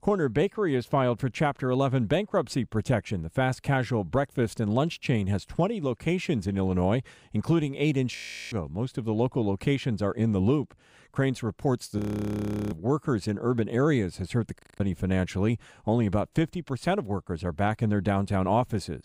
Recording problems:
audio freezing; at 8 s, at 12 s for 0.5 s and at 15 s

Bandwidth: 15.5 kHz